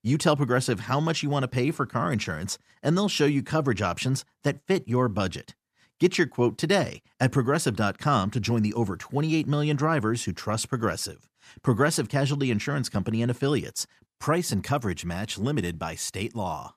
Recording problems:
none

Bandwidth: 14.5 kHz